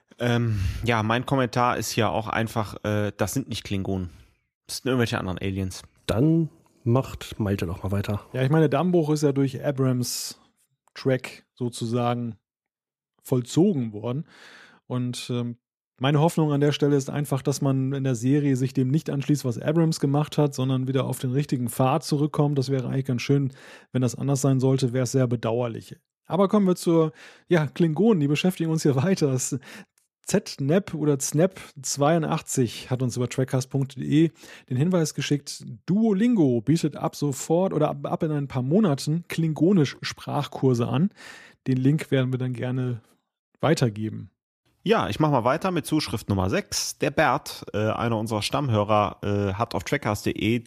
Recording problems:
none

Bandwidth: 14.5 kHz